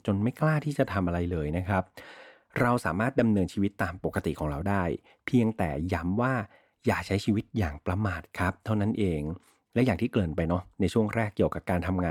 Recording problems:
abrupt cut into speech; at the end

